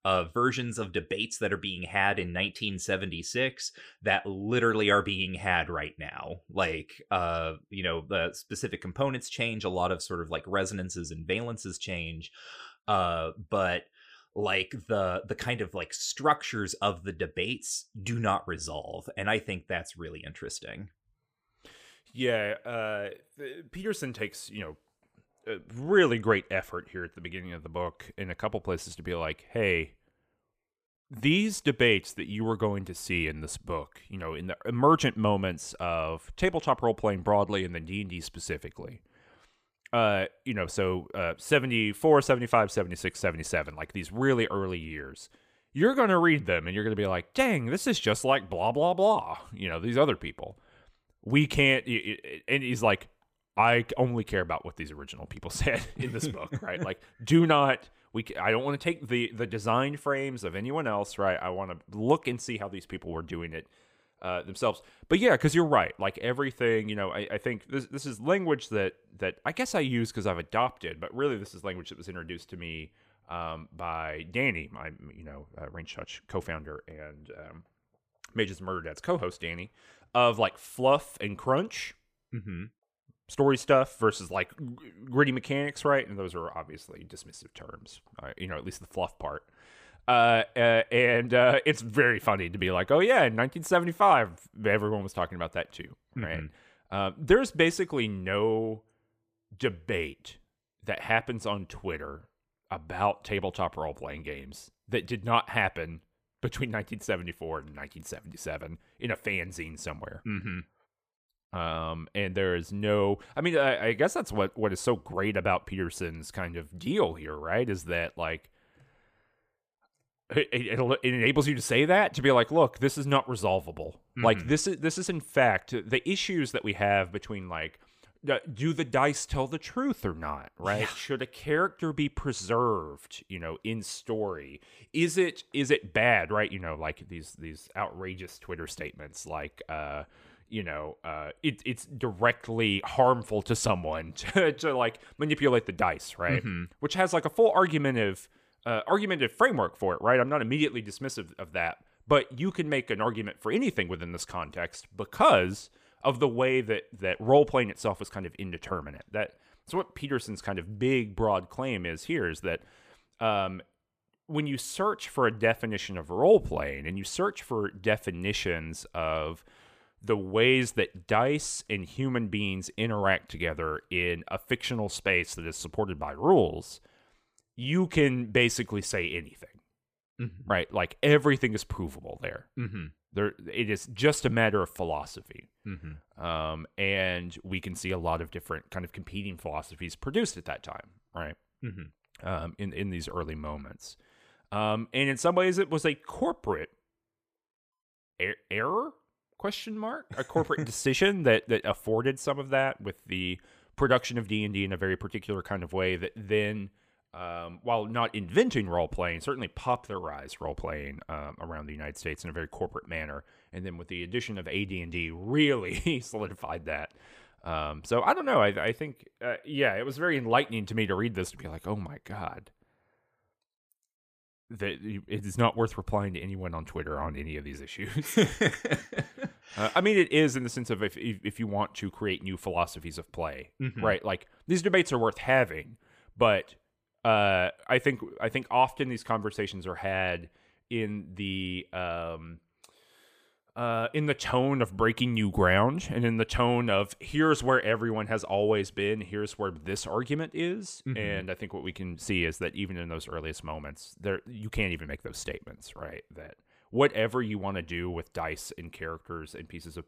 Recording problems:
none

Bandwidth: 15 kHz